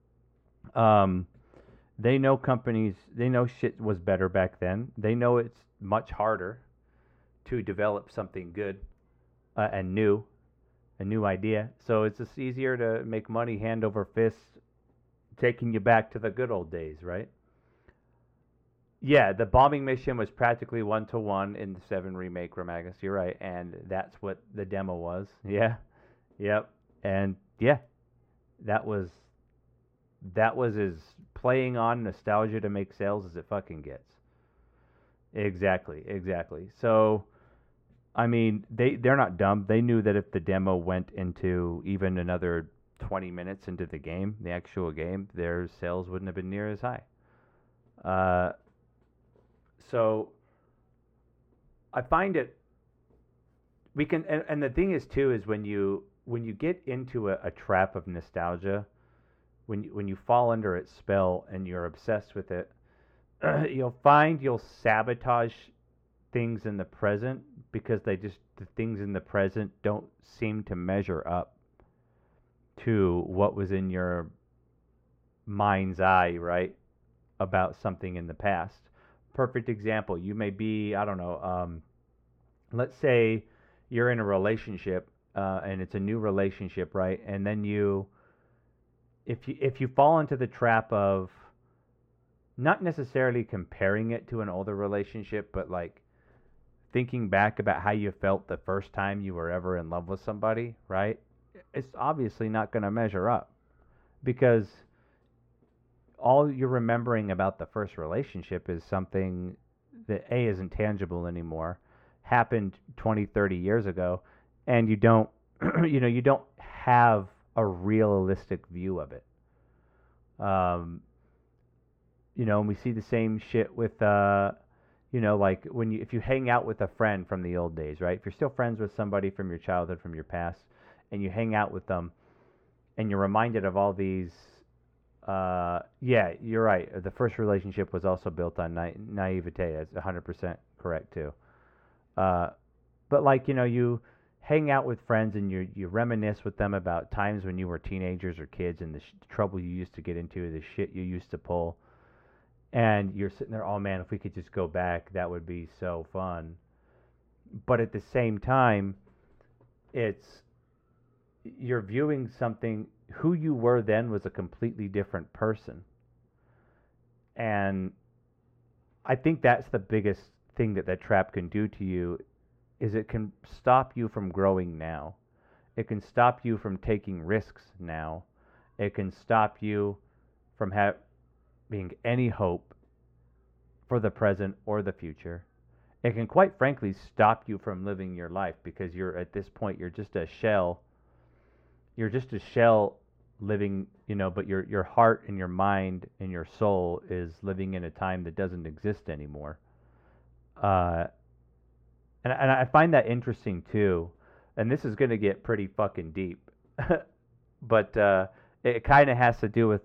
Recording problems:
muffled; very; fading above 3.5 kHz

